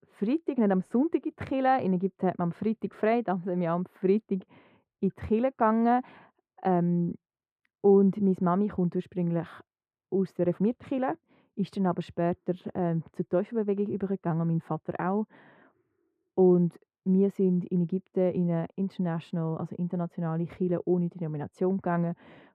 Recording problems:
muffled; very; fading above 3 kHz

